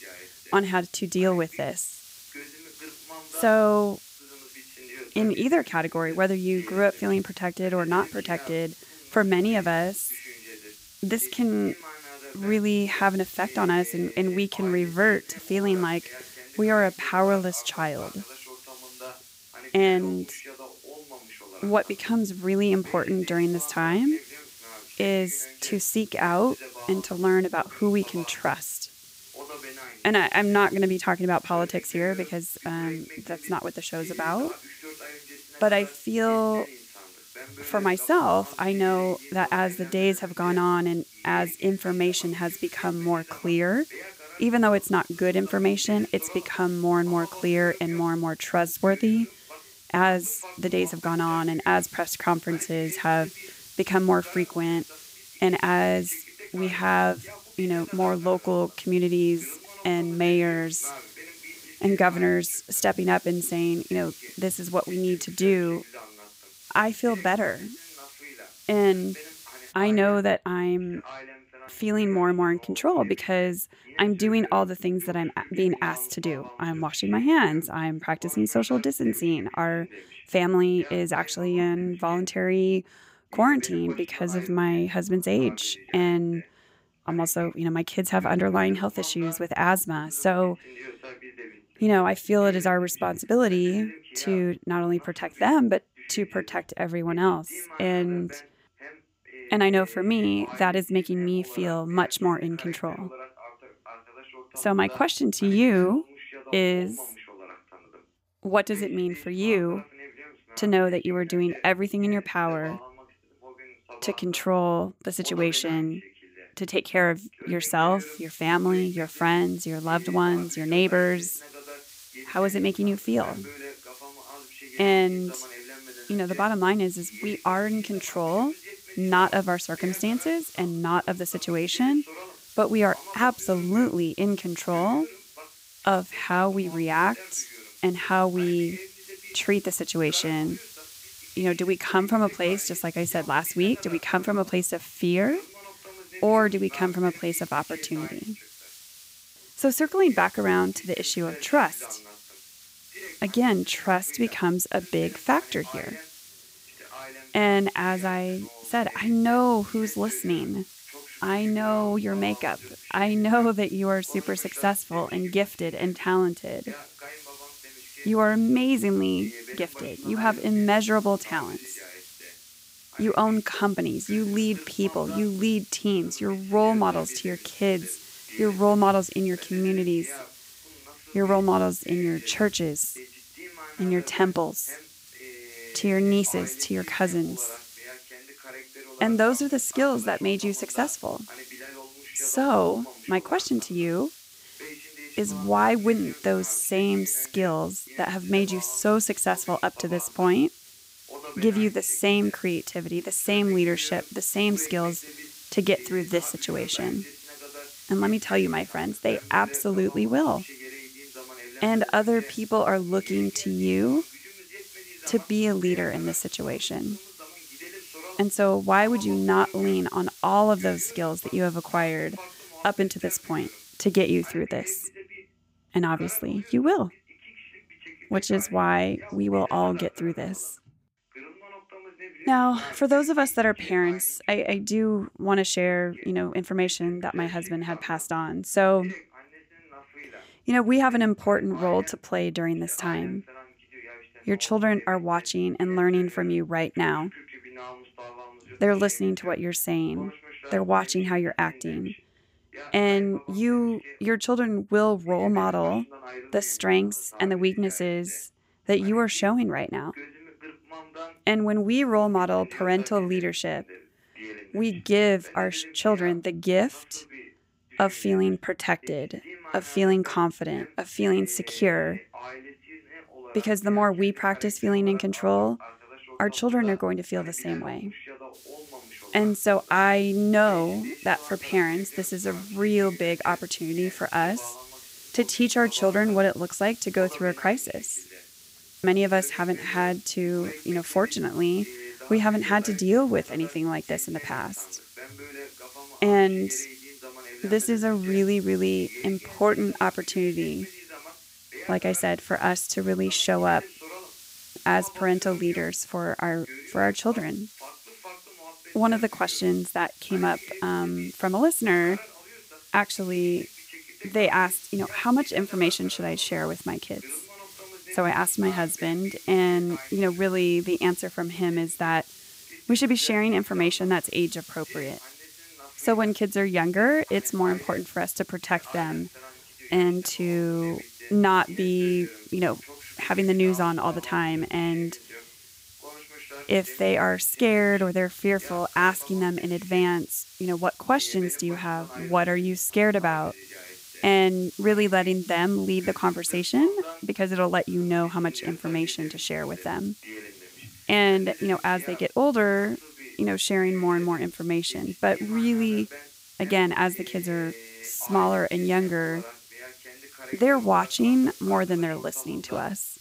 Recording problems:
voice in the background; noticeable; throughout; 20 dB below the speech
hiss; faint; until 1:10, from 1:58 to 3:44 and from 4:38 on; 20 dB below the speech

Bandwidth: 15.5 kHz